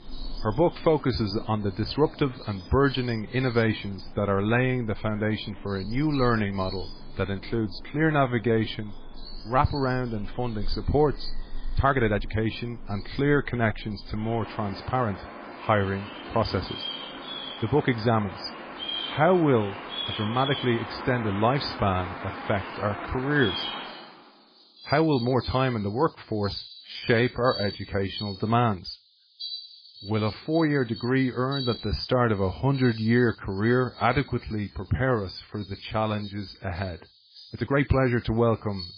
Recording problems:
garbled, watery; badly
animal sounds; noticeable; throughout; 10 dB below the speech
uneven, jittery; strongly; from 1.5 to 38 s

